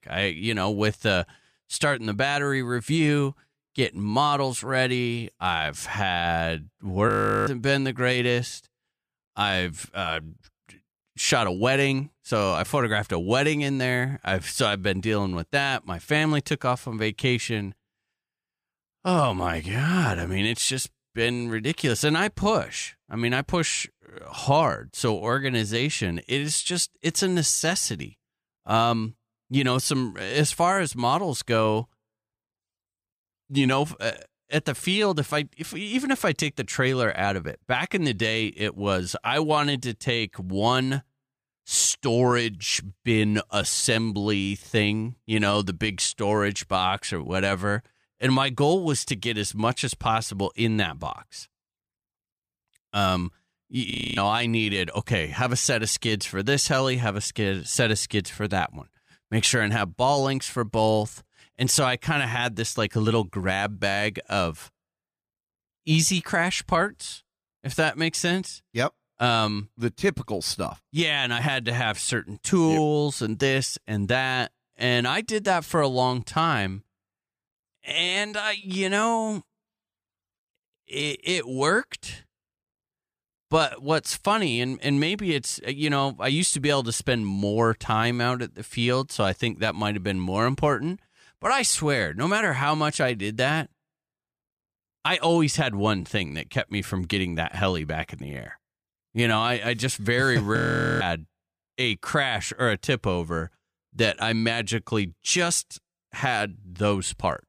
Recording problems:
audio freezing; at 7 s, at 54 s and at 1:41

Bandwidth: 15 kHz